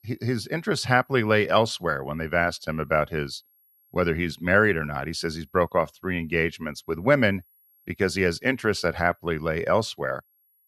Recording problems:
high-pitched whine; faint; throughout; 11.5 kHz, 35 dB below the speech

